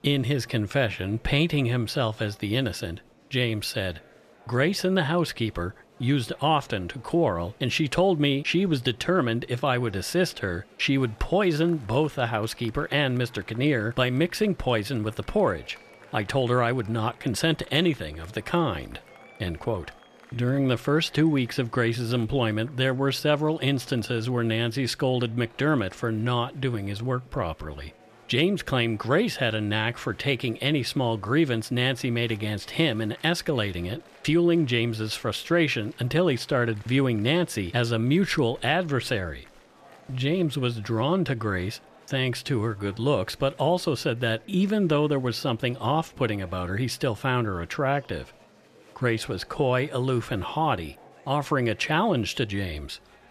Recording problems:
murmuring crowd; faint; throughout; 25 dB below the speech

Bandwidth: 14 kHz